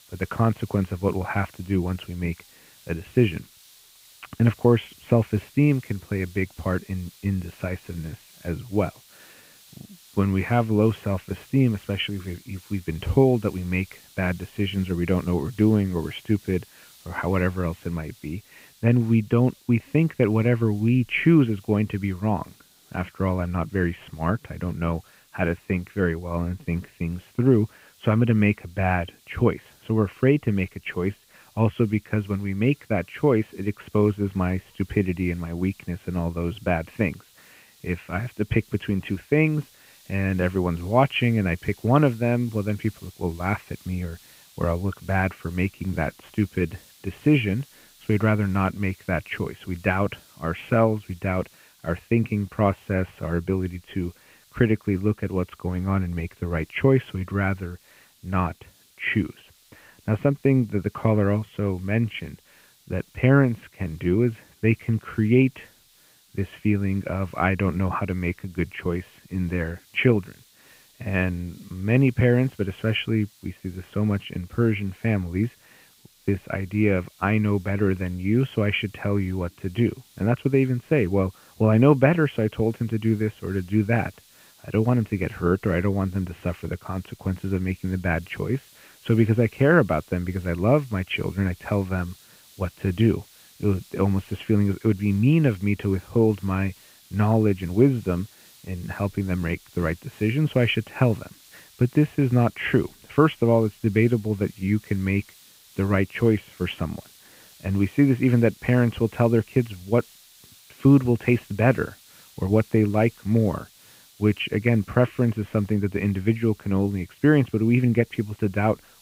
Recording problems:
high frequencies cut off; severe; nothing above 3 kHz
hiss; faint; throughout; 25 dB below the speech

